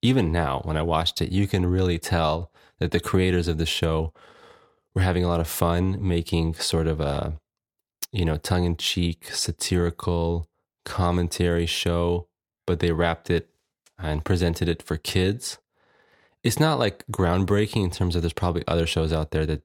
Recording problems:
none

